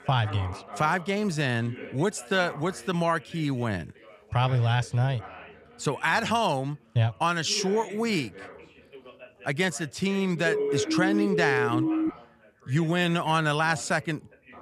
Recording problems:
background chatter; noticeable; throughout; 3 voices, 15 dB below the speech
siren; loud; from 10 to 12 s; peak level with the speech

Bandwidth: 14.5 kHz